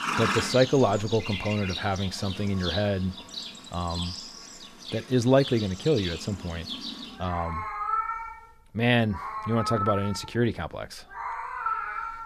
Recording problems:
animal sounds; loud; throughout; 6 dB below the speech

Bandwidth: 14.5 kHz